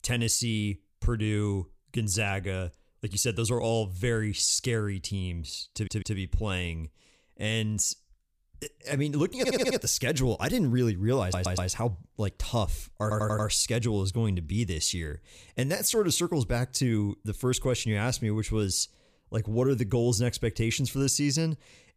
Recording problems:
audio stuttering; 4 times, first at 5.5 s

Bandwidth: 15 kHz